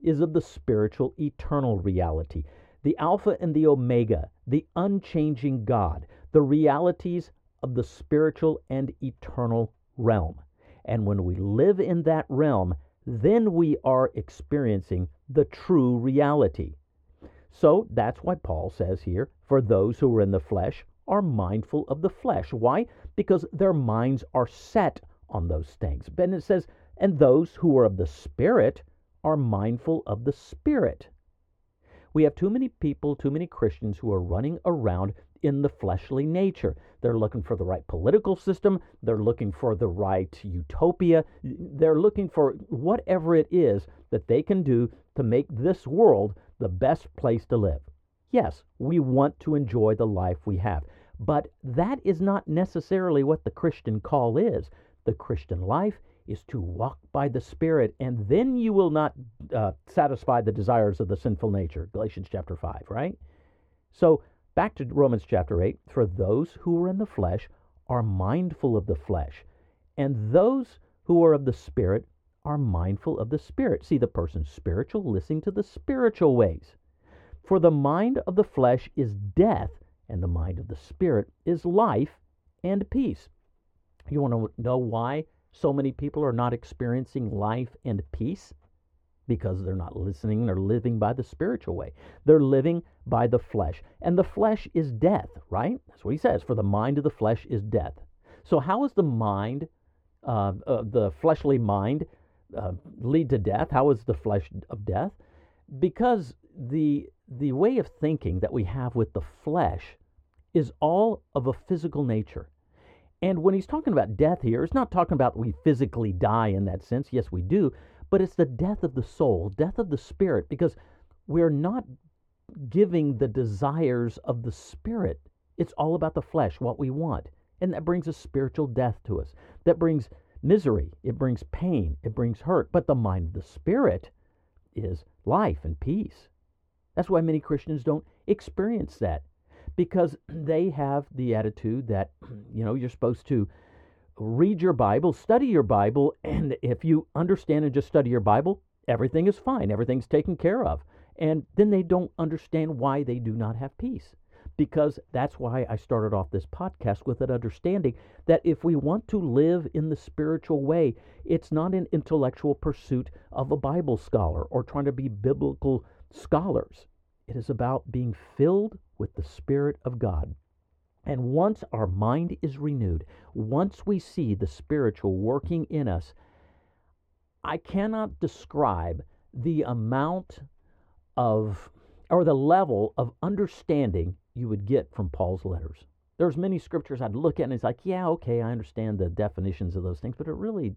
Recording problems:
muffled; very; fading above 3.5 kHz

